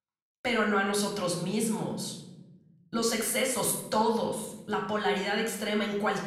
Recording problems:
room echo; noticeable; dies away in 1 s
off-mic speech; somewhat distant

